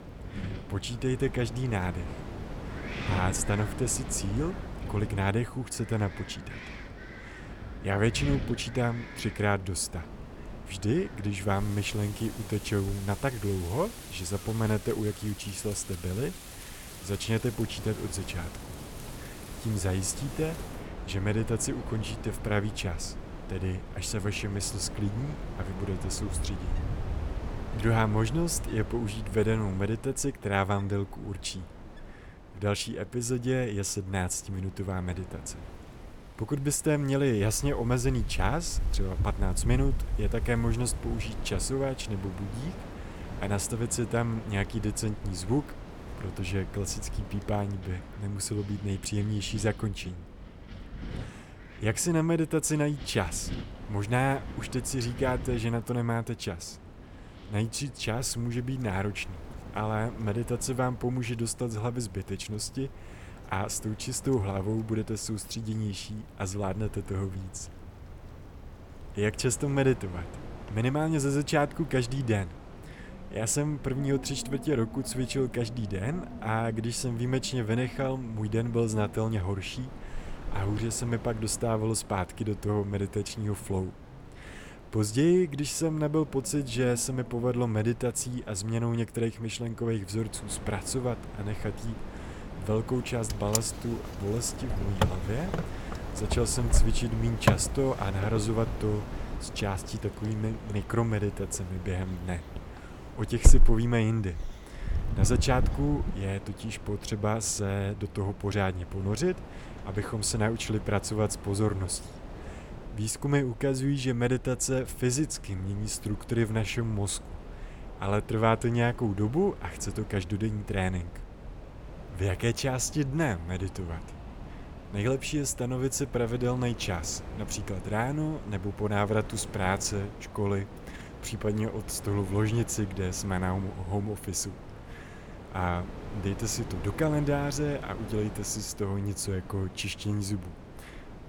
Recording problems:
wind in the background; loud; throughout; 9 dB below the speech

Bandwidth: 17 kHz